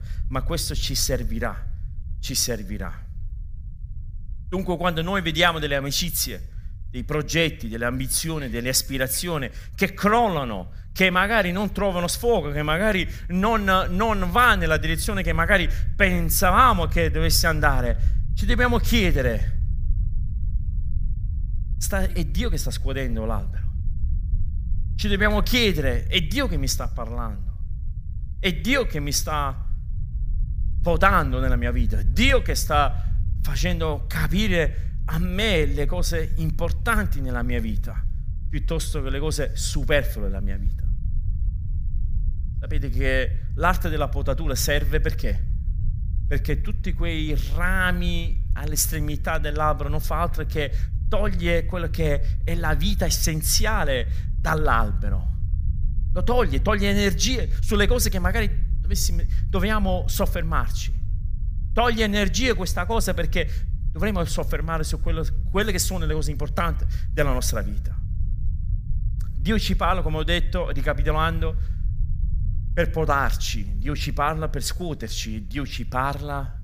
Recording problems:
low rumble; faint; throughout; 25 dB below the speech

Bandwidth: 15 kHz